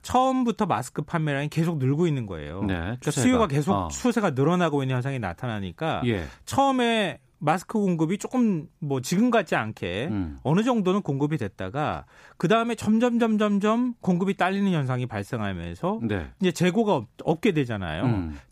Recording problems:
none

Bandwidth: 15 kHz